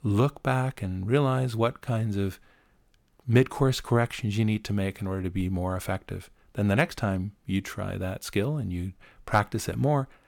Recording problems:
none

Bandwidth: 17.5 kHz